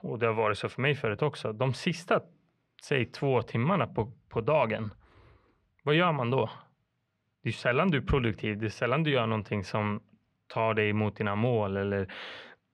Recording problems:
muffled; slightly; fading above 2.5 kHz

